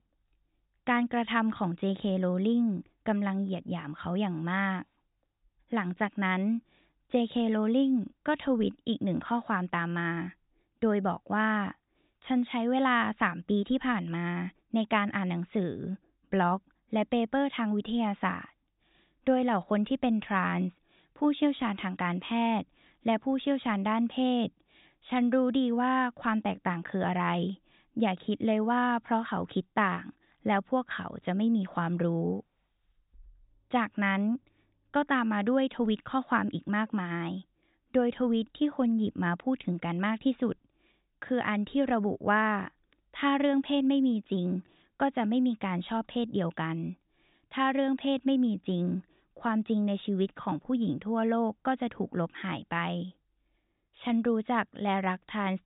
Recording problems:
high frequencies cut off; severe; nothing above 4 kHz

